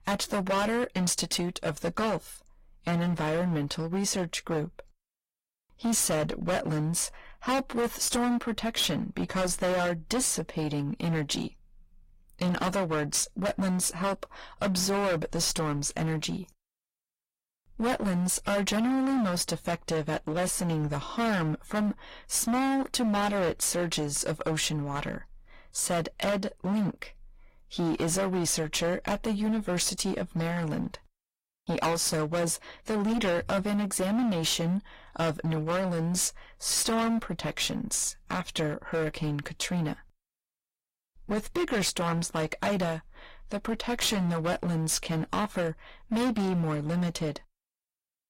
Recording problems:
distortion; heavy; 17% of the sound clipped
garbled, watery; slightly; nothing above 15.5 kHz

